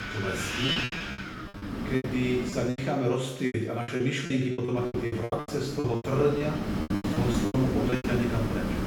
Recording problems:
off-mic speech; far
room echo; noticeable; dies away in 0.9 s
wind noise on the microphone; heavy; until 3 s and from 5 s on; 2 dB below the speech
choppy; very; 17% of the speech affected

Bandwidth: 17.5 kHz